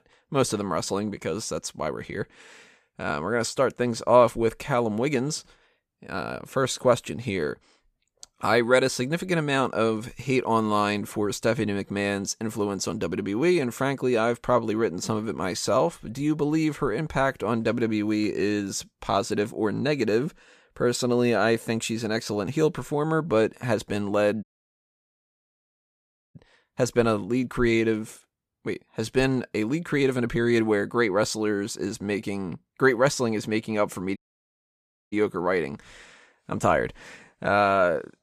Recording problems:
audio cutting out; at 24 s for 2 s and at 34 s for 1 s

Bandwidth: 14.5 kHz